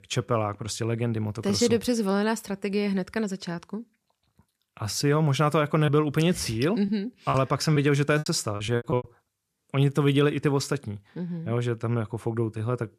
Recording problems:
choppy; very; from 6 to 9 s; 13% of the speech affected

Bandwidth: 14.5 kHz